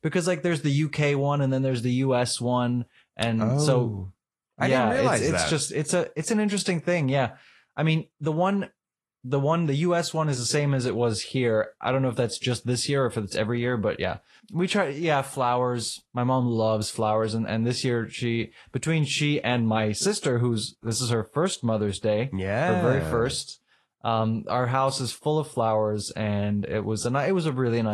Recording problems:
garbled, watery; slightly
abrupt cut into speech; at the end

